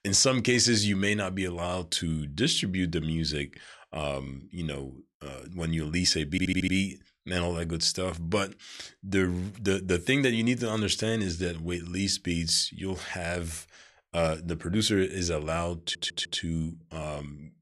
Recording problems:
audio stuttering; at 6.5 s and at 16 s

